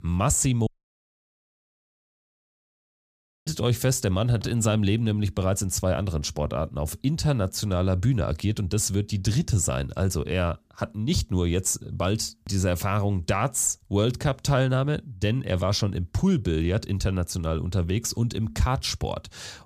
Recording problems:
audio cutting out; at 0.5 s for 3 s

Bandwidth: 15 kHz